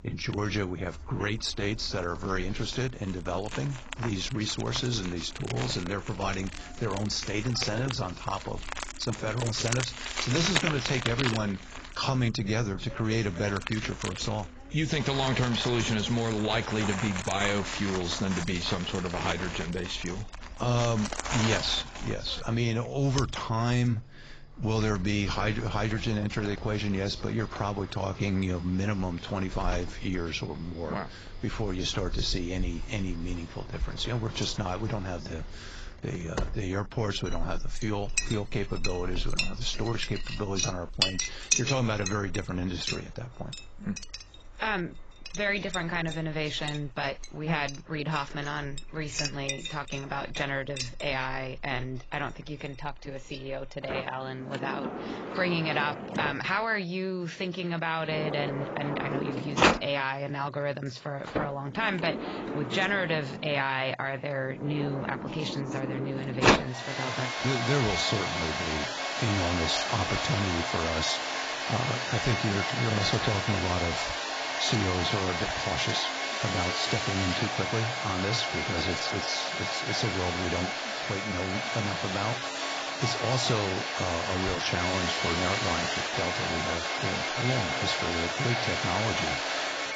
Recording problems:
garbled, watery; badly; nothing above 7.5 kHz
household noises; loud; throughout; 1 dB below the speech

